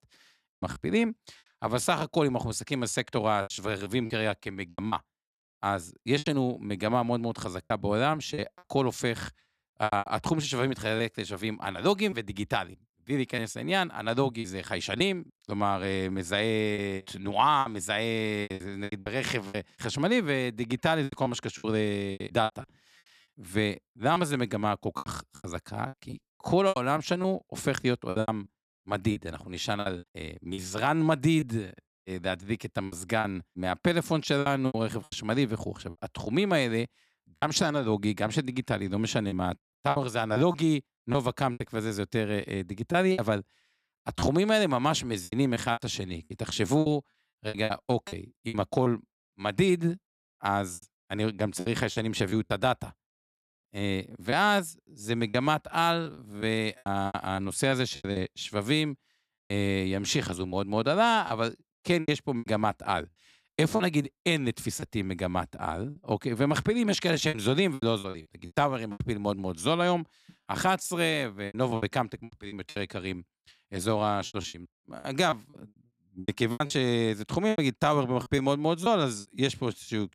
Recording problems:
choppy; very; 9% of the speech affected

